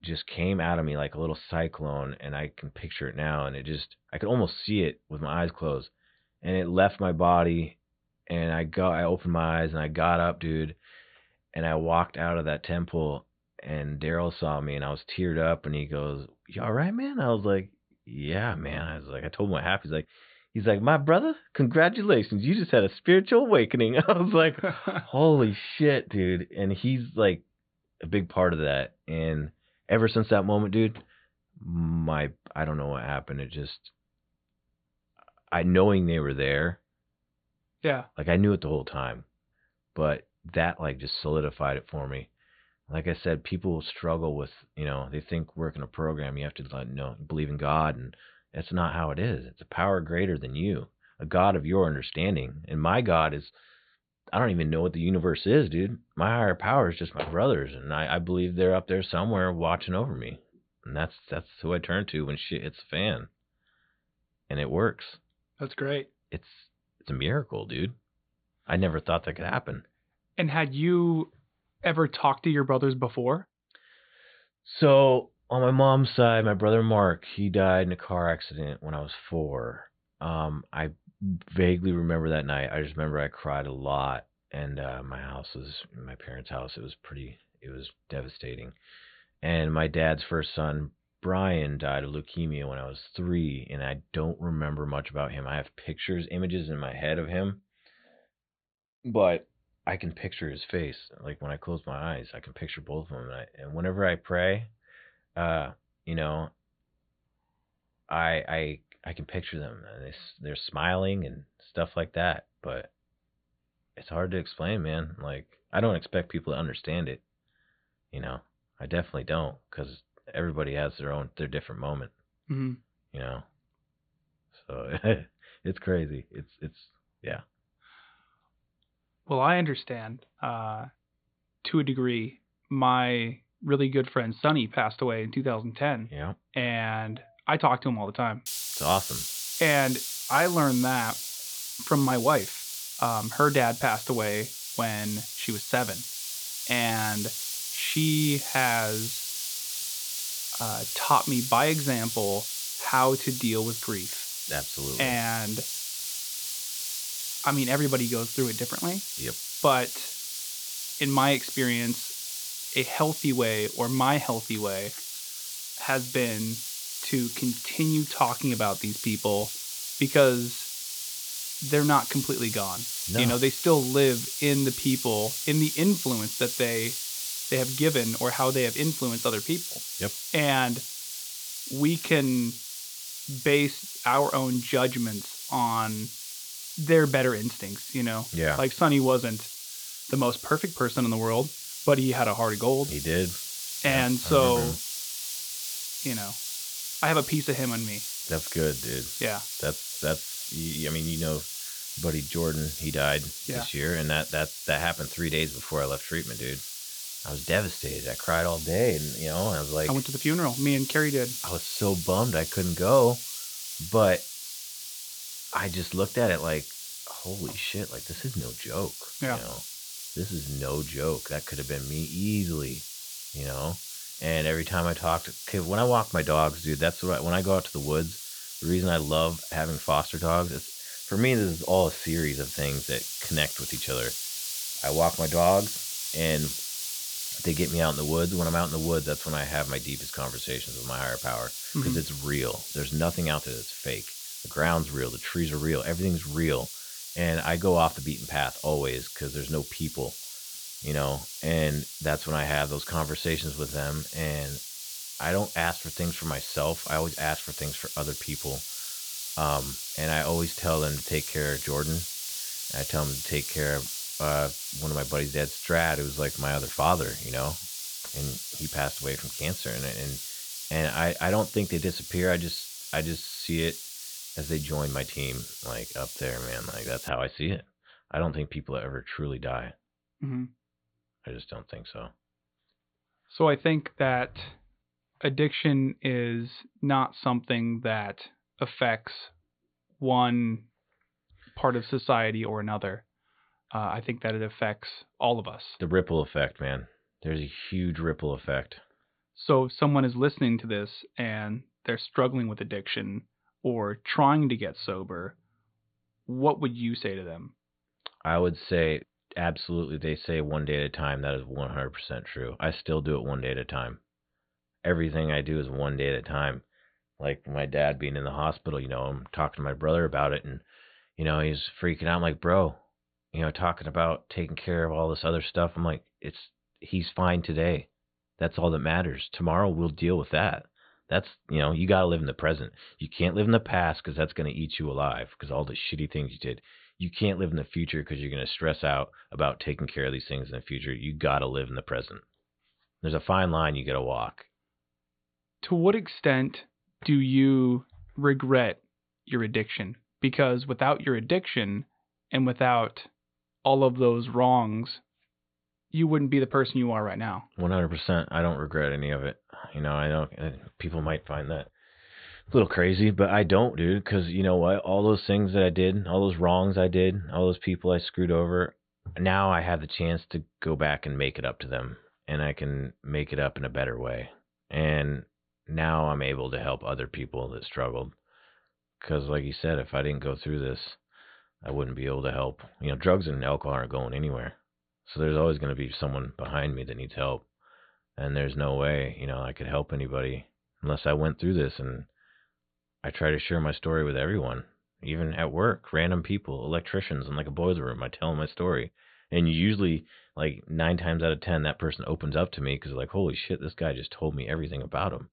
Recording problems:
high frequencies cut off; severe; nothing above 4.5 kHz
hiss; loud; from 2:18 to 4:37; 5 dB below the speech

